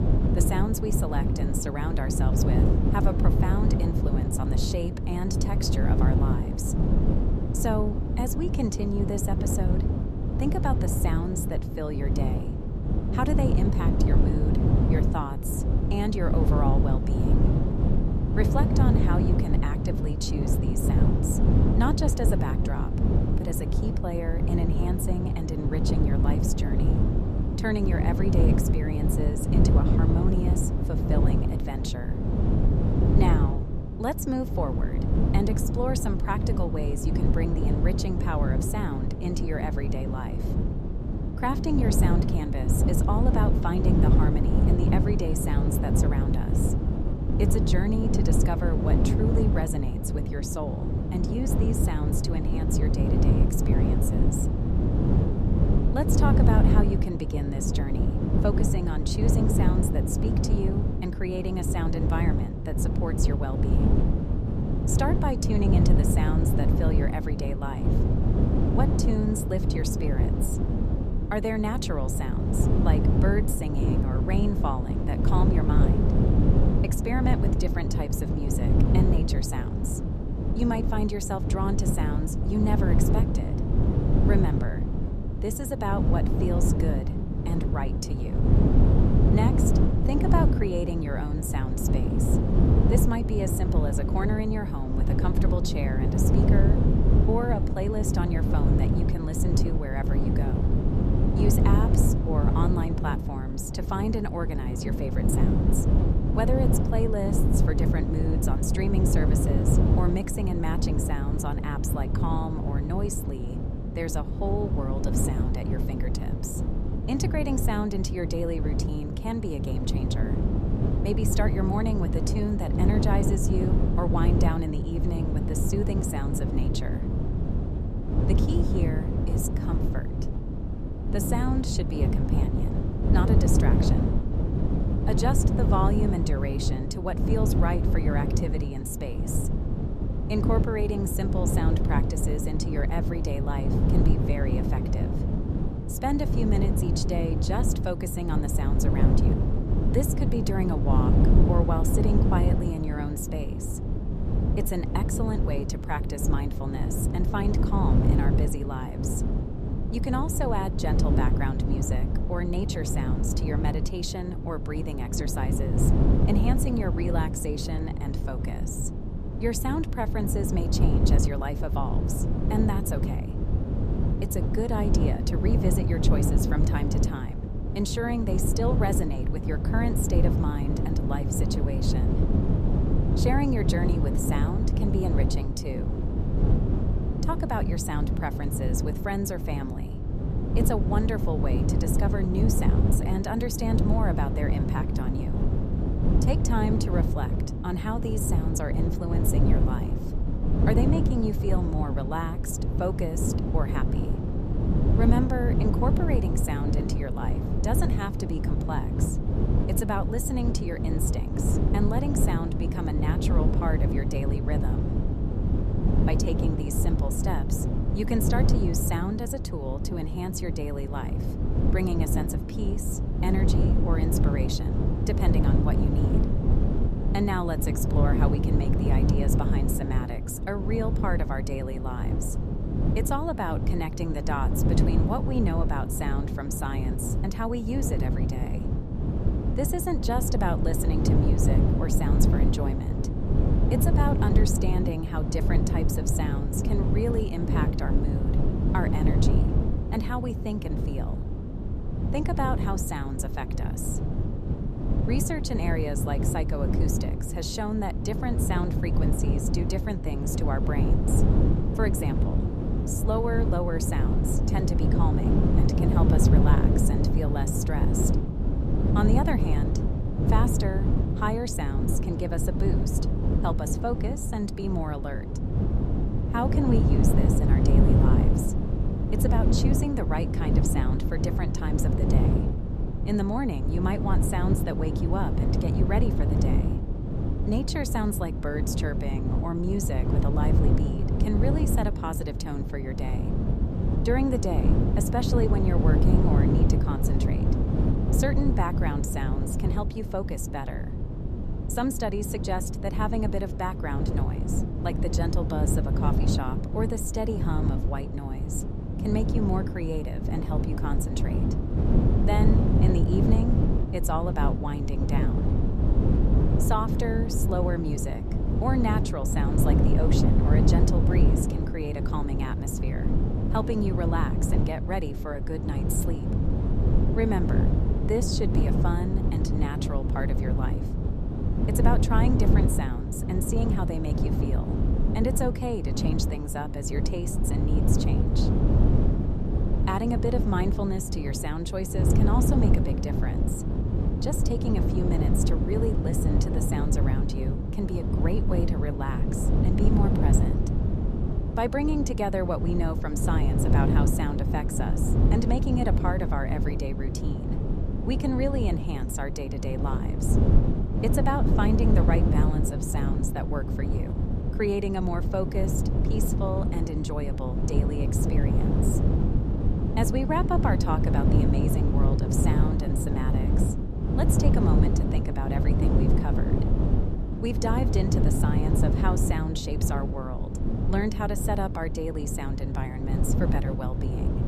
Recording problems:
wind noise on the microphone; heavy; 1 dB below the speech

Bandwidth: 14 kHz